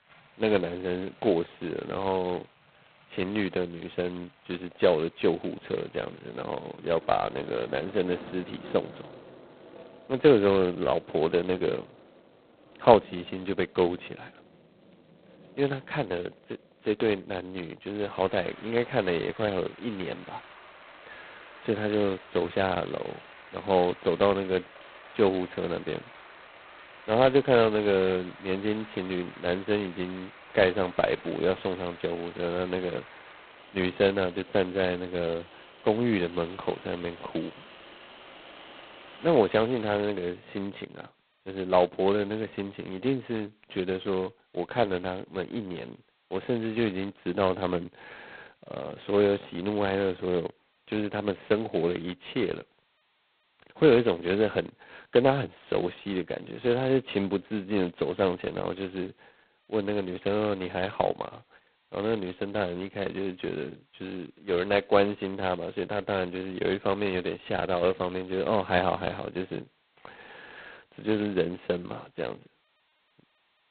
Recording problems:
phone-call audio; poor line; nothing above 4 kHz
rain or running water; faint; until 40 s; 20 dB below the speech

